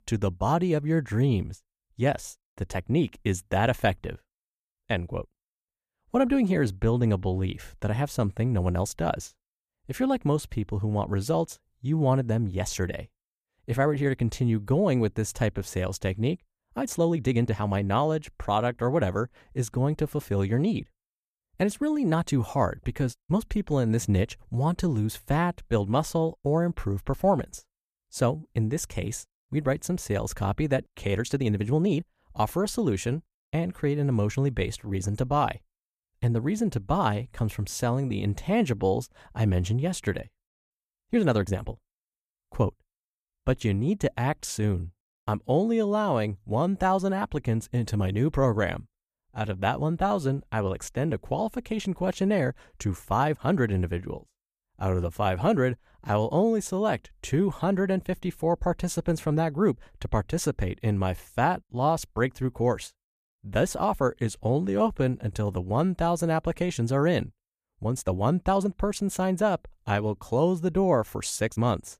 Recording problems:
uneven, jittery; strongly; from 17 s to 1:09

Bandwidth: 14.5 kHz